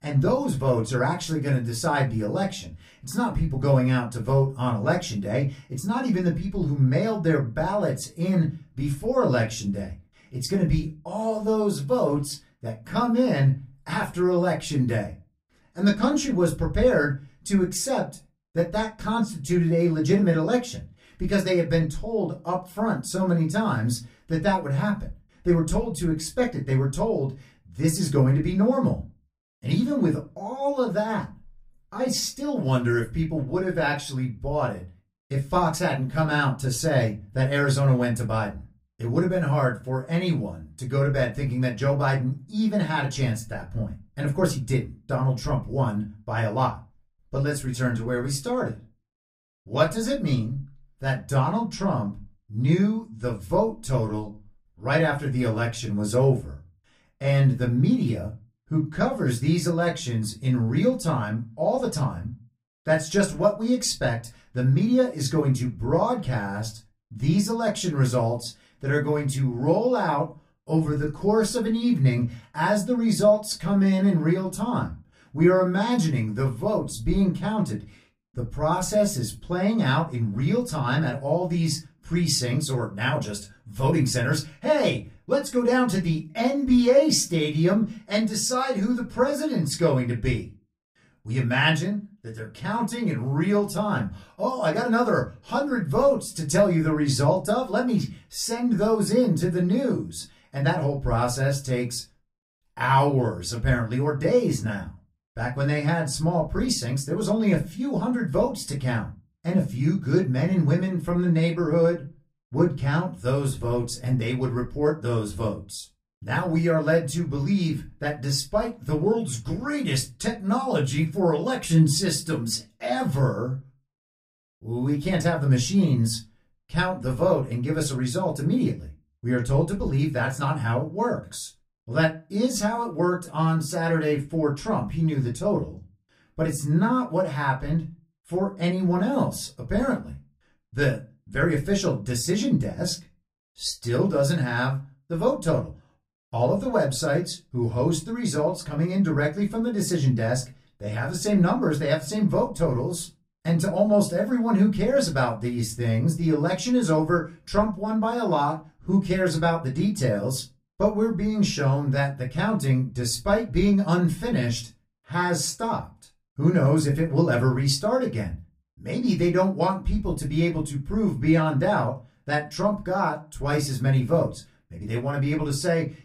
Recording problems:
off-mic speech; far
room echo; very slight; dies away in 0.2 s

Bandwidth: 15 kHz